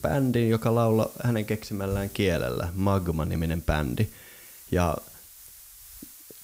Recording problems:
hiss; noticeable; throughout; 20 dB below the speech

